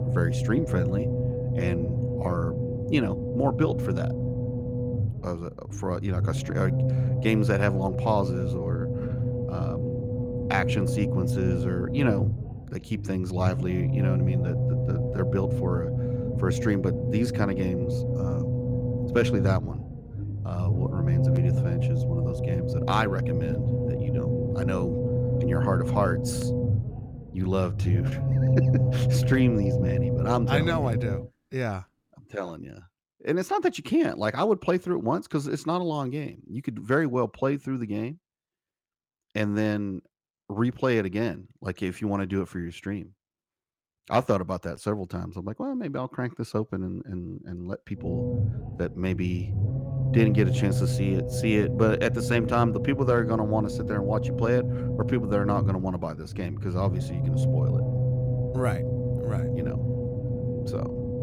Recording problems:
low rumble; loud; until 31 s and from 48 s on; 4 dB below the speech

